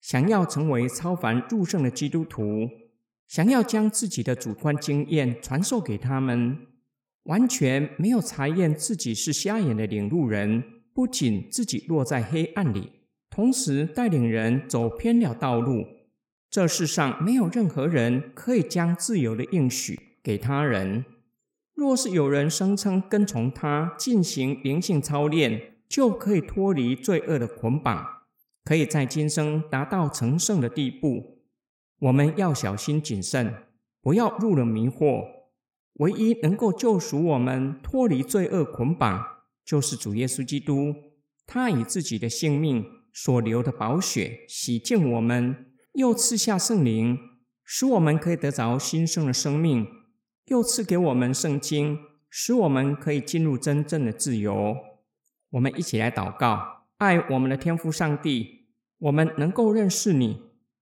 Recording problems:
echo of what is said; noticeable; throughout; 80 ms later, 15 dB below the speech

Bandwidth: 17.5 kHz